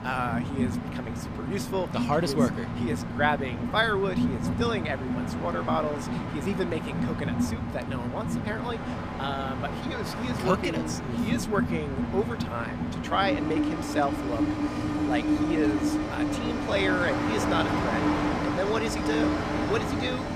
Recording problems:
train or aircraft noise; very loud; throughout; 1 dB above the speech

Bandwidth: 15 kHz